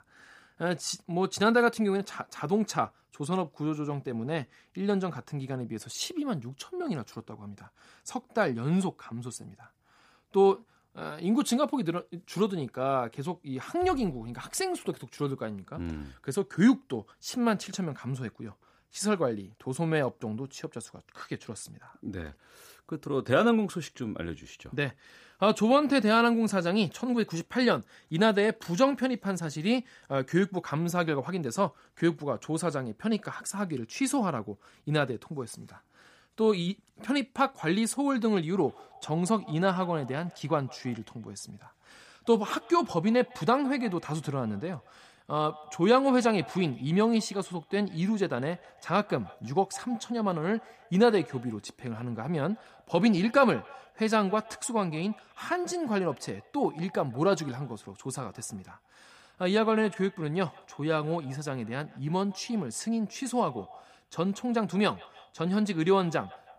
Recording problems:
echo of what is said; faint; from 39 s on; 160 ms later, 20 dB below the speech

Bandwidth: 15 kHz